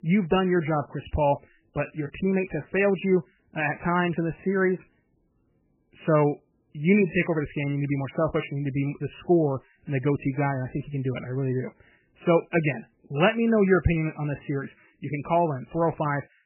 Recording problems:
garbled, watery; badly; nothing above 3 kHz

